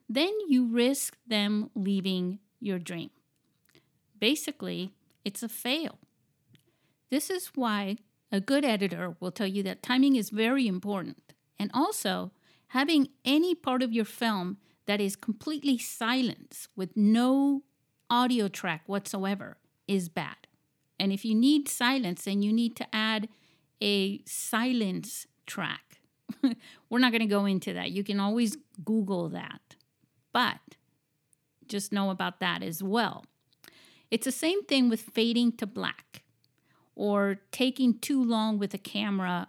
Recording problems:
none

